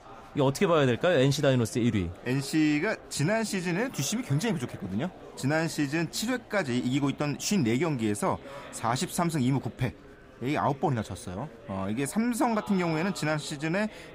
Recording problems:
murmuring crowd; noticeable; throughout; 20 dB below the speech

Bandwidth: 15.5 kHz